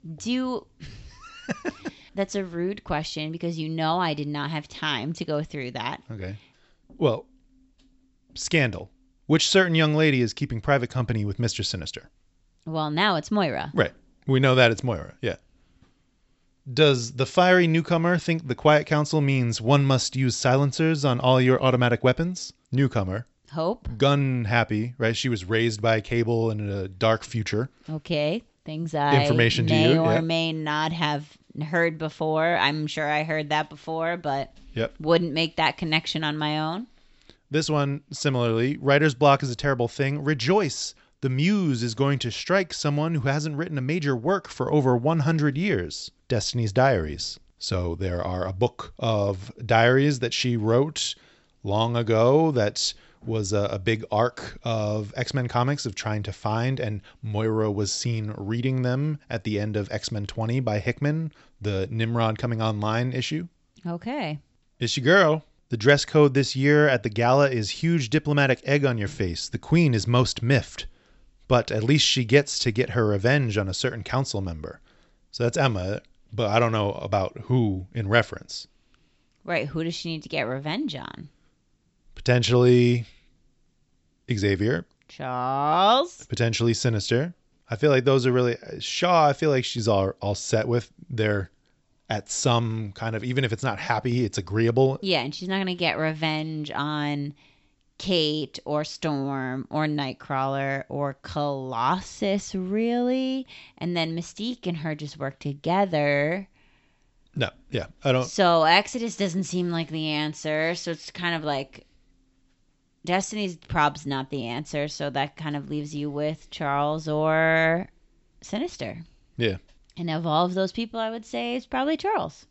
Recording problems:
high frequencies cut off; noticeable; nothing above 7.5 kHz

